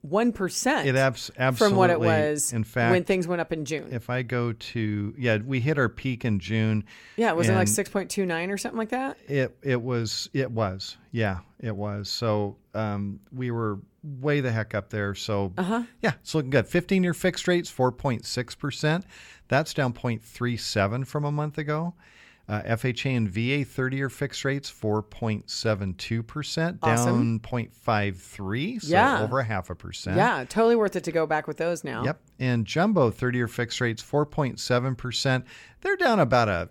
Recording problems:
none

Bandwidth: 17 kHz